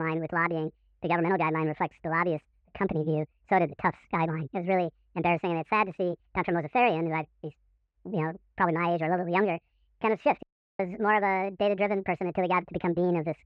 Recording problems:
muffled; very; fading above 2.5 kHz
wrong speed and pitch; too fast and too high; 1.6 times normal speed
abrupt cut into speech; at the start
audio cutting out; at 10 s

